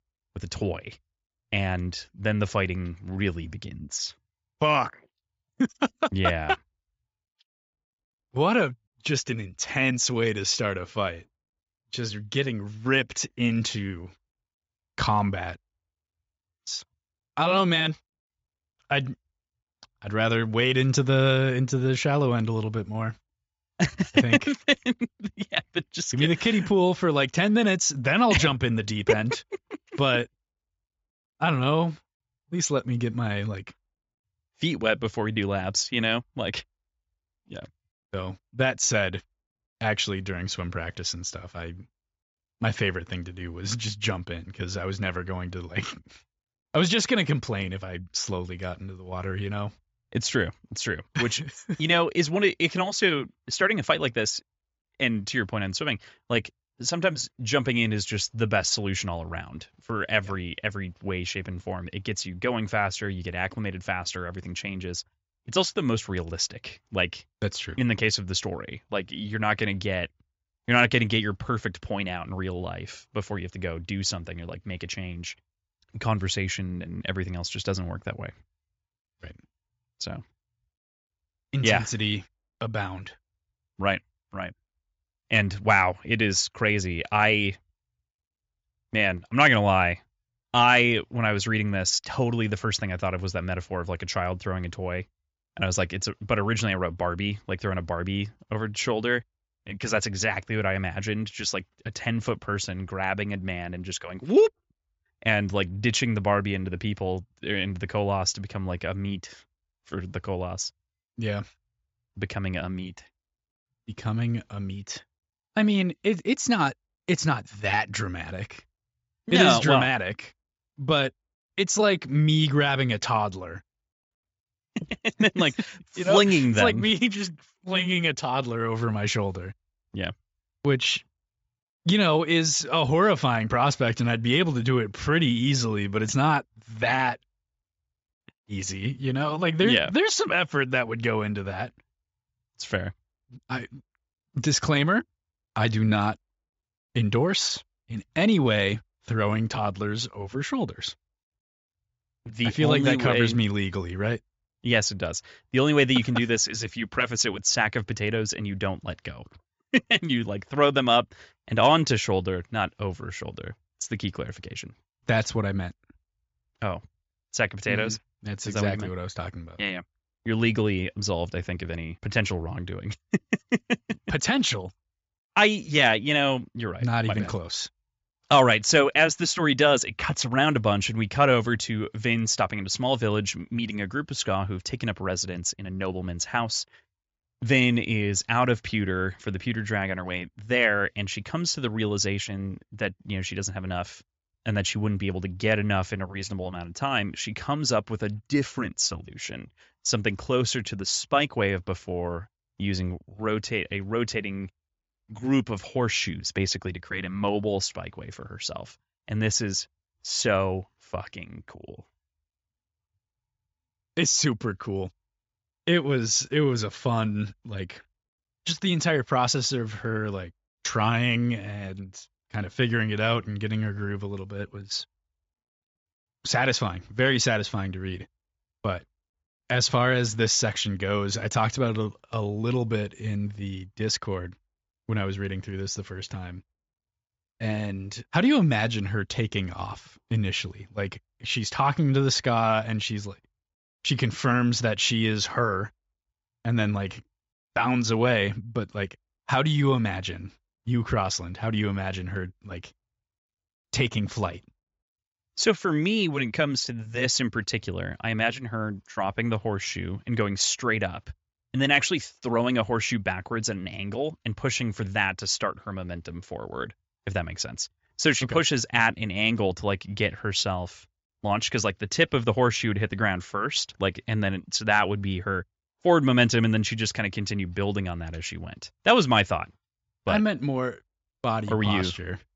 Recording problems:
high frequencies cut off; noticeable; nothing above 7 kHz

